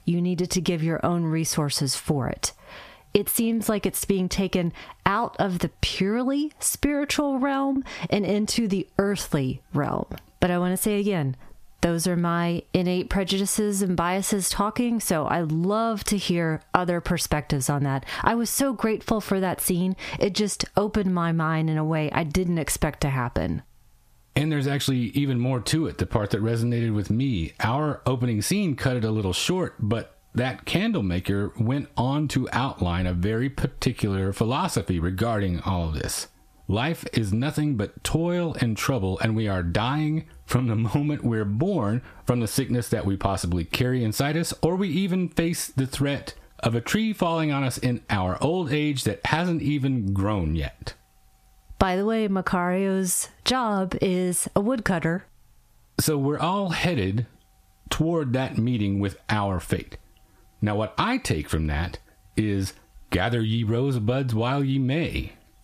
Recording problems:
squashed, flat; heavily

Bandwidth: 14.5 kHz